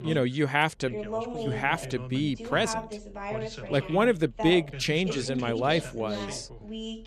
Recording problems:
background chatter; loud; throughout; 2 voices, 9 dB below the speech

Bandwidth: 13.5 kHz